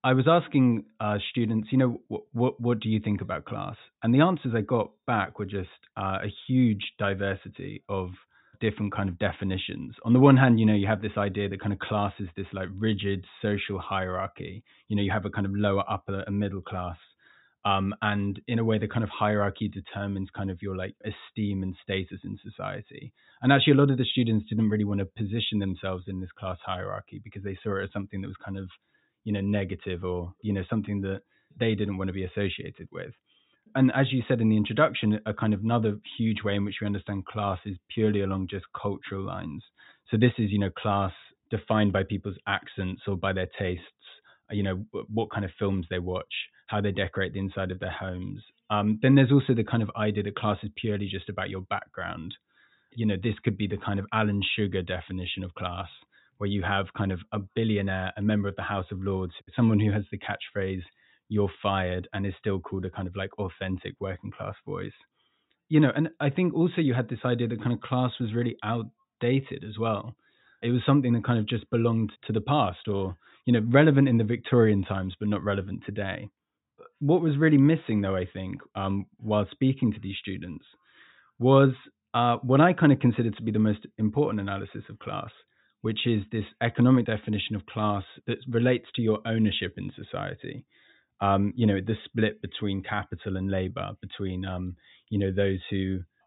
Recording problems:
high frequencies cut off; severe; nothing above 4 kHz

